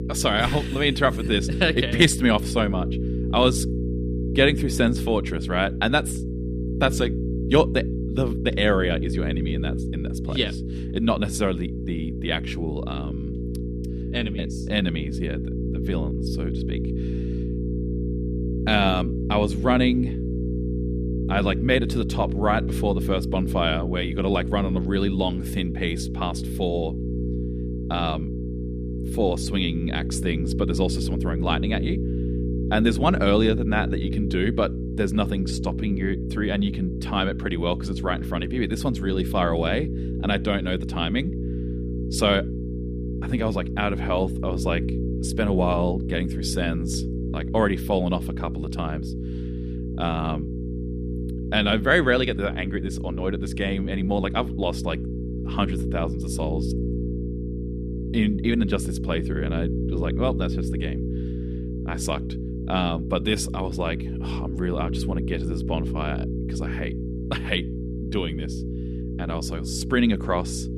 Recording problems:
electrical hum; loud; throughout; 60 Hz, 10 dB below the speech

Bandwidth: 14.5 kHz